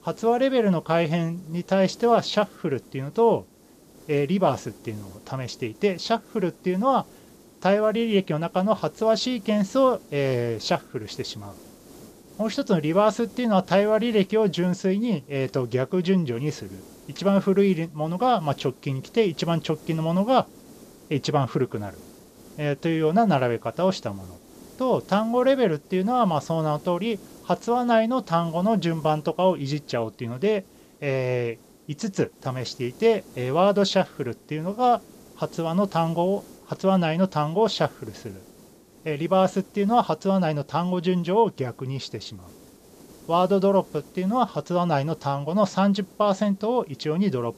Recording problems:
high frequencies cut off; noticeable; nothing above 8 kHz
hiss; faint; throughout; 25 dB below the speech

